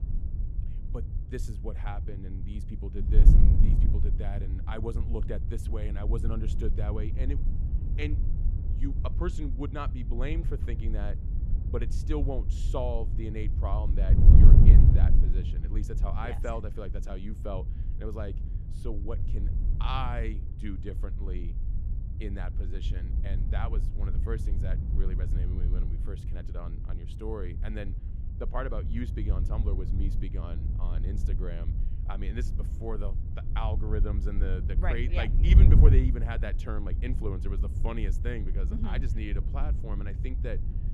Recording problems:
wind noise on the microphone; heavy; 5 dB below the speech

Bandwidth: 15 kHz